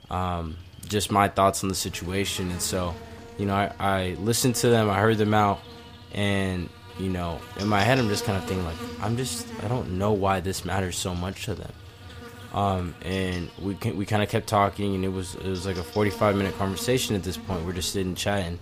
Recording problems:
animal sounds; noticeable; throughout; 15 dB below the speech

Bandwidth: 15 kHz